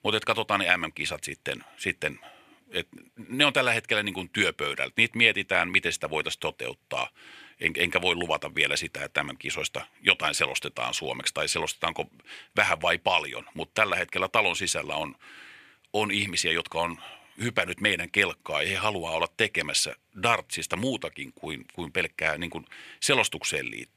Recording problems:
thin; somewhat; fading below 500 Hz

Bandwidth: 14.5 kHz